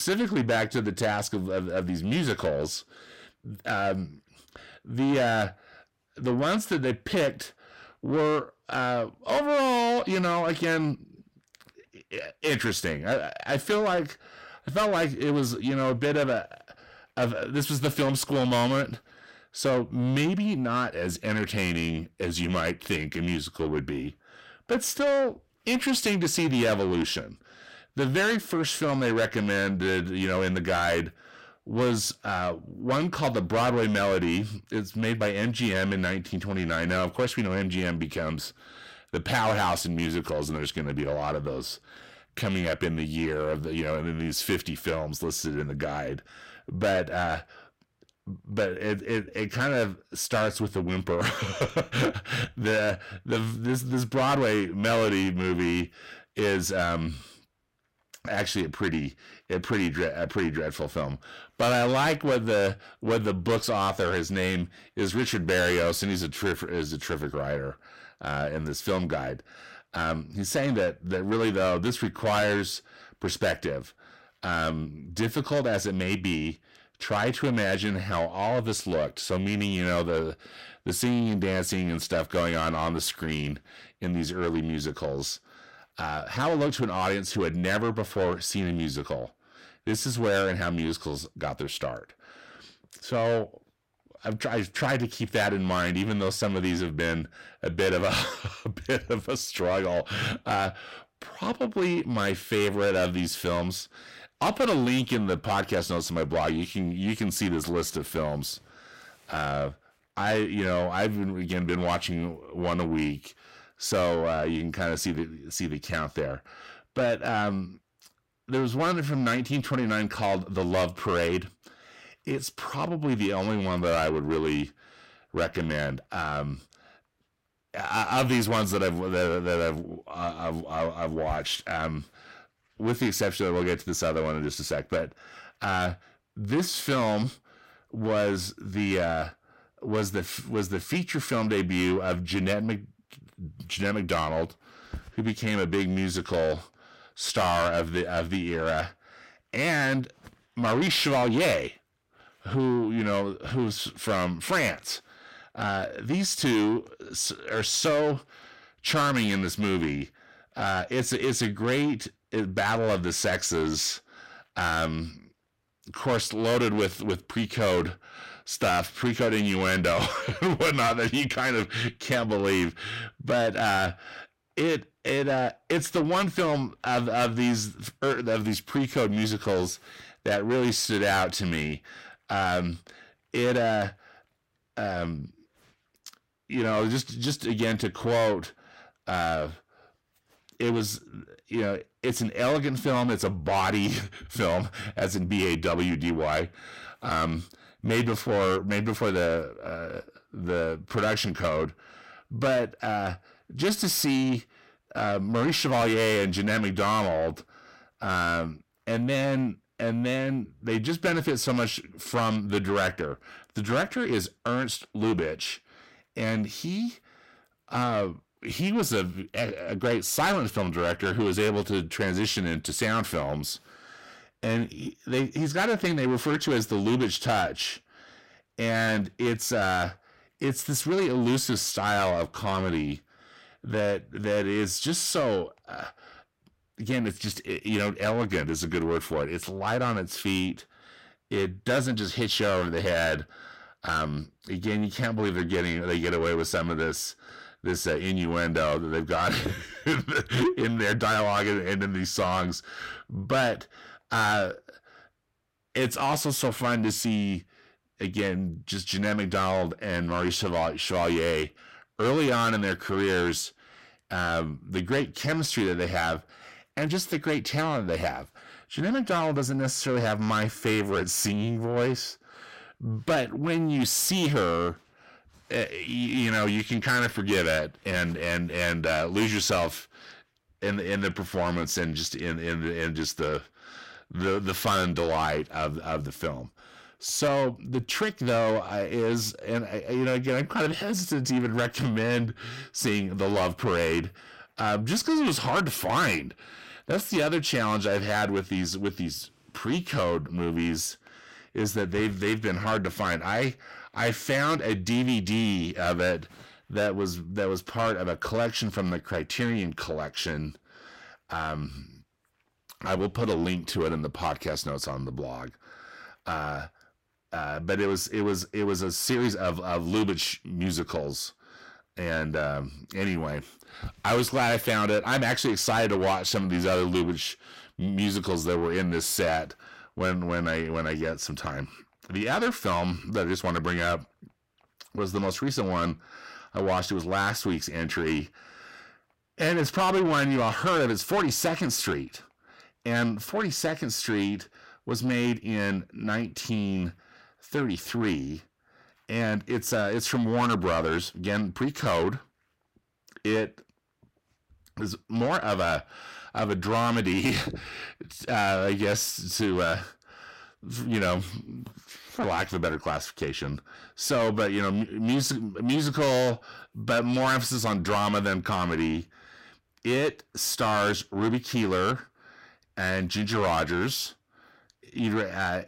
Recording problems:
distortion; heavy; 7 dB below the speech
abrupt cut into speech; at the start

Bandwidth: 16 kHz